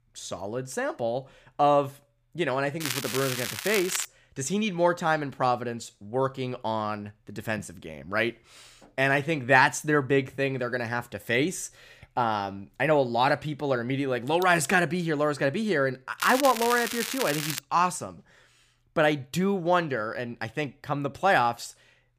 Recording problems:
crackling; loud; from 3 to 4 s and from 16 to 18 s; 5 dB below the speech

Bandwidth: 15 kHz